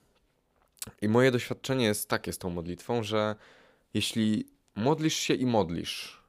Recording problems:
none

